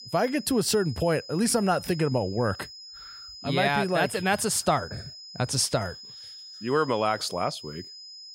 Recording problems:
high-pitched whine; noticeable; throughout; 5 kHz, 15 dB below the speech

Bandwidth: 16 kHz